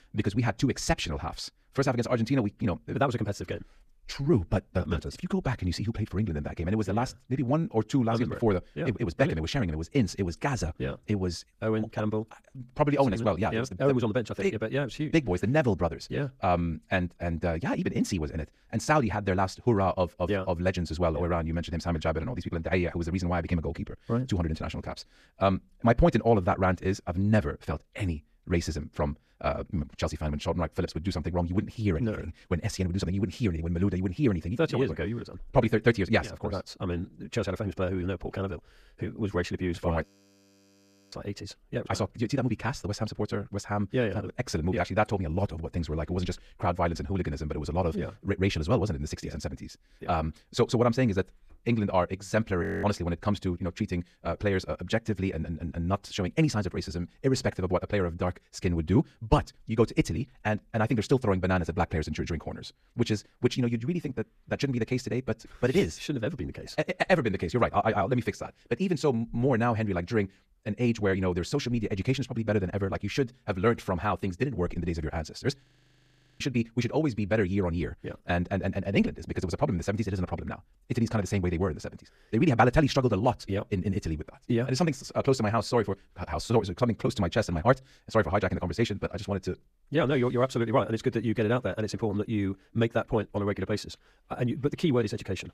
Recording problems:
wrong speed, natural pitch; too fast; 1.6 times normal speed
audio freezing; at 40 s for 1 s, at 53 s and at 1:16 for 1 s

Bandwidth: 14.5 kHz